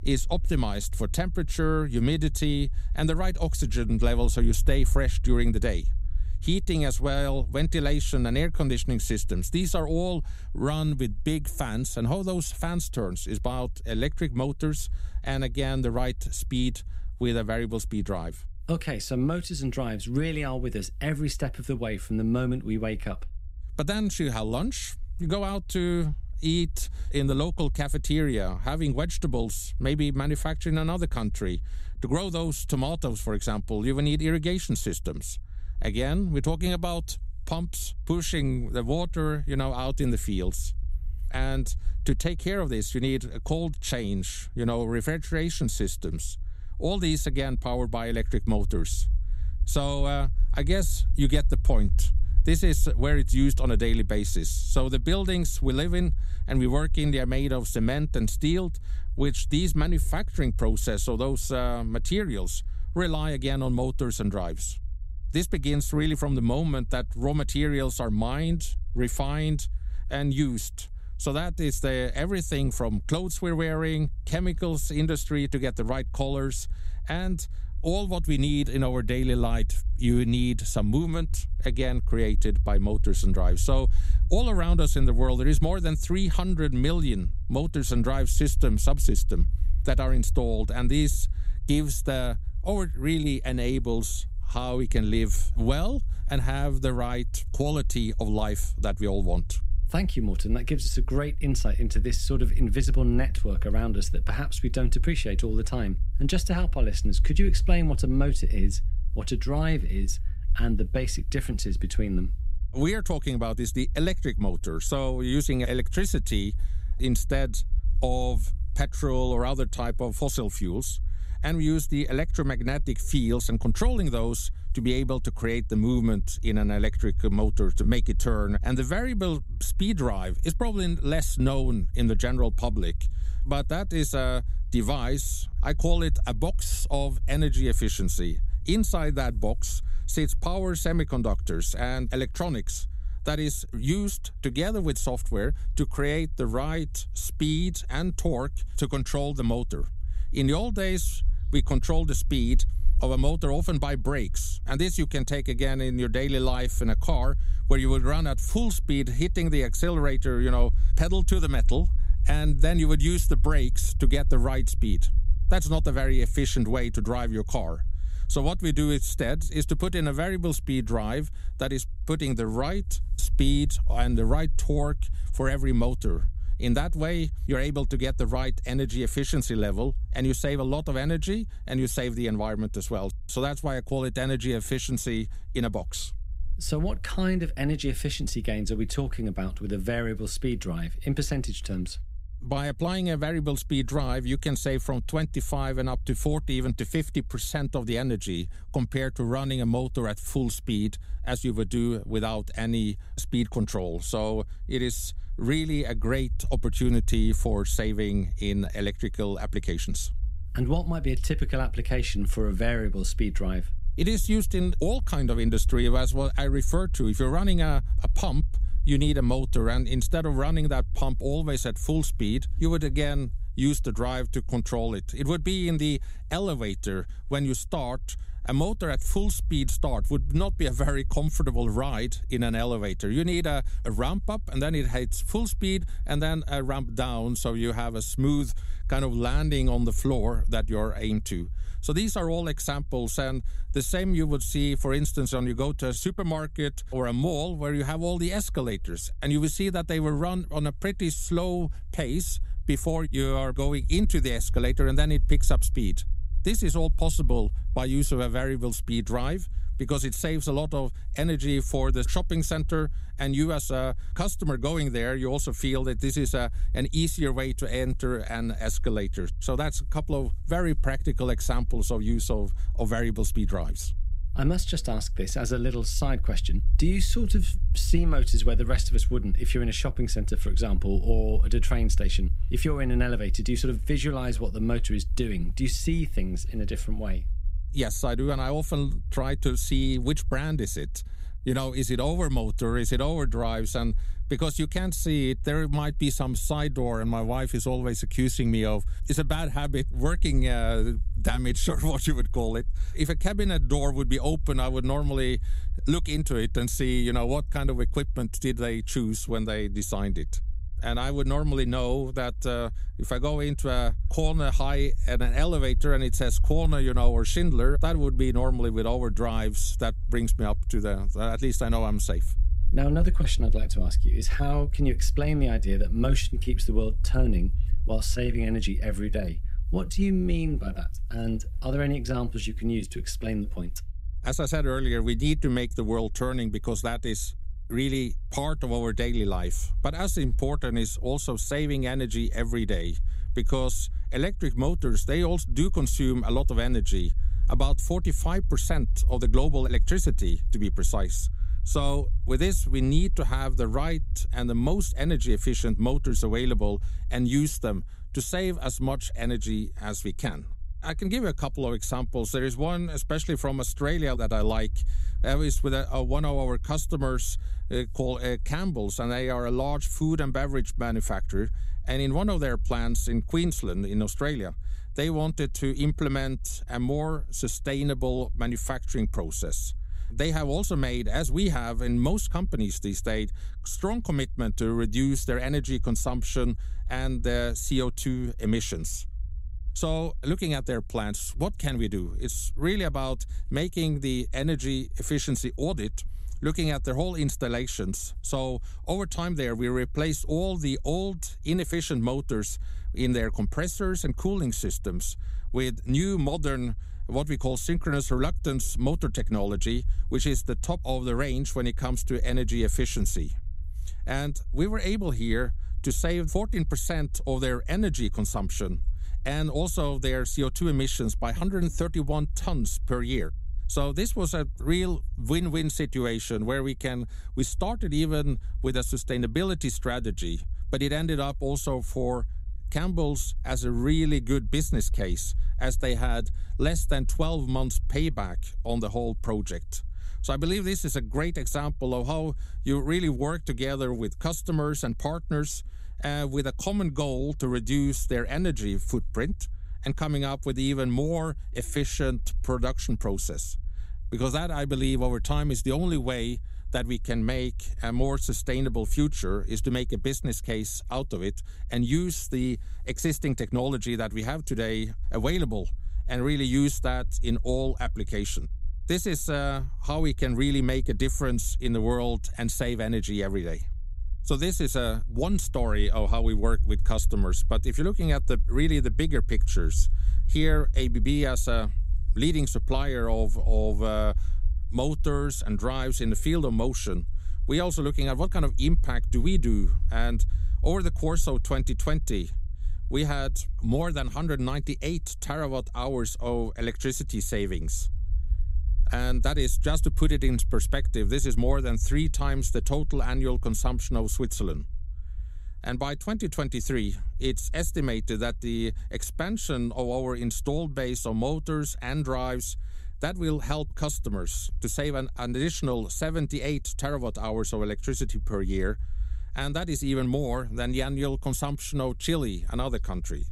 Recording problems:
low rumble; faint; throughout; 25 dB below the speech

